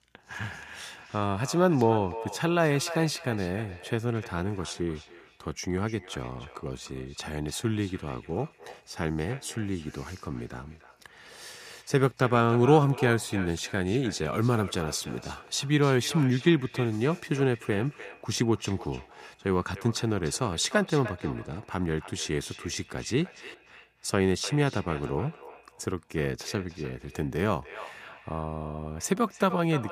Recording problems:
echo of what is said; noticeable; throughout; 300 ms later, 15 dB below the speech

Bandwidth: 14.5 kHz